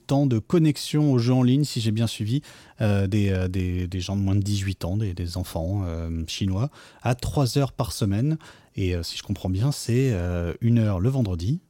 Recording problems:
none

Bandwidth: 16.5 kHz